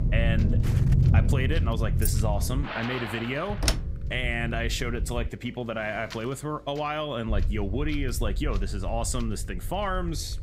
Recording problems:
rain or running water; loud; until 3.5 s; 6 dB below the speech
wind noise on the microphone; occasional gusts; 20 dB below the speech
low rumble; noticeable; until 2.5 s, from 3.5 to 5.5 s and from 7.5 s on; 10 dB below the speech
electrical hum; faint; throughout; 50 Hz, 25 dB below the speech
footsteps; faint; at 0.5 s; peak 10 dB below the speech
jangling keys; noticeable; at 2 s; peak 3 dB below the speech
door banging; loud; at 3.5 s; peak 3 dB above the speech

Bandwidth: 15.5 kHz